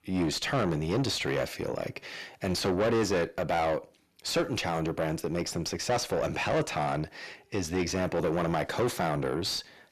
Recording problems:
distortion; heavy; 6 dB below the speech

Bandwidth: 14 kHz